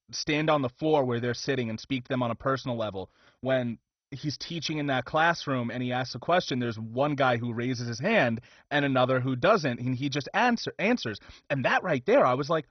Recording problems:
garbled, watery; badly; nothing above 6 kHz

